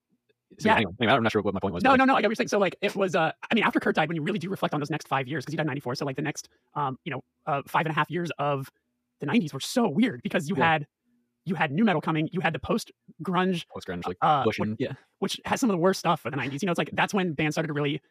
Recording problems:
wrong speed, natural pitch; too fast; 1.8 times normal speed

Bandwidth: 14.5 kHz